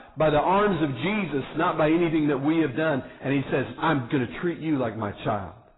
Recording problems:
distortion; heavy; 7 dB below the speech
garbled, watery; badly; nothing above 4 kHz

